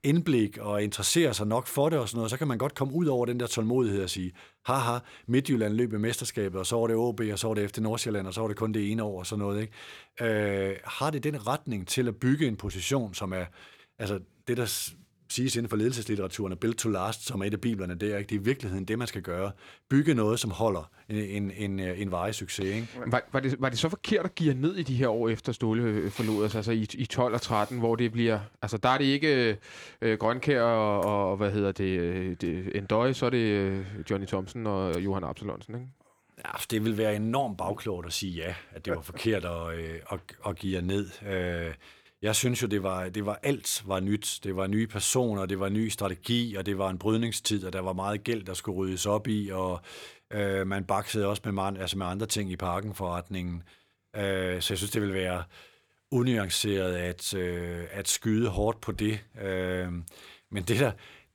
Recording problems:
none

